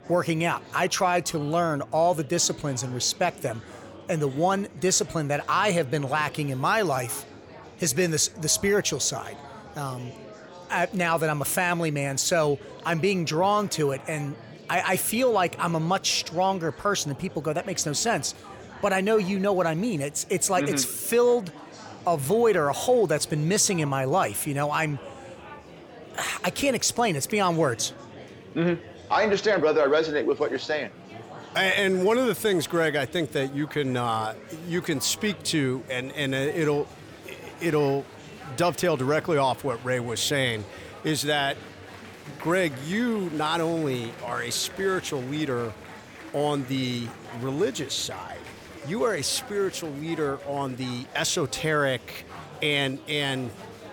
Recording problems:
murmuring crowd; noticeable; throughout; 20 dB below the speech

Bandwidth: 18.5 kHz